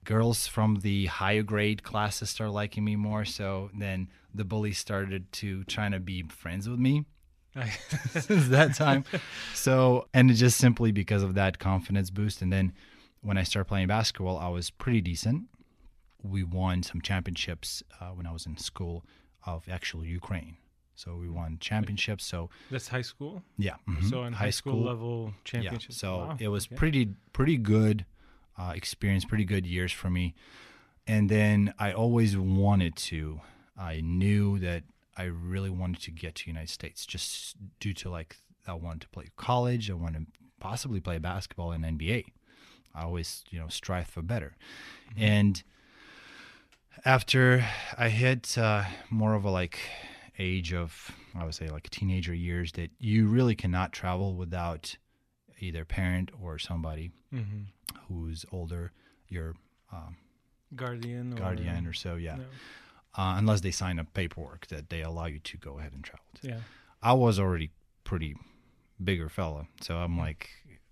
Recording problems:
none

